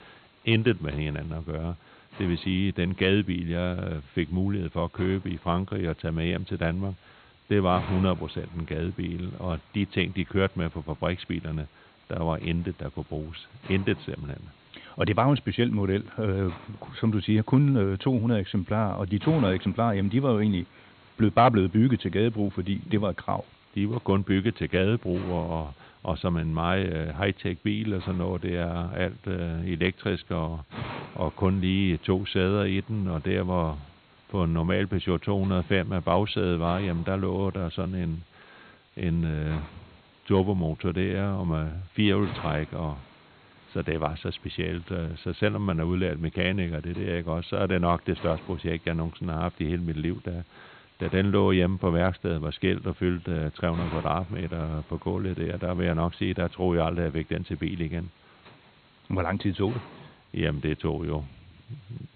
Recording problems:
high frequencies cut off; severe; nothing above 4 kHz
hiss; faint; throughout; 20 dB below the speech

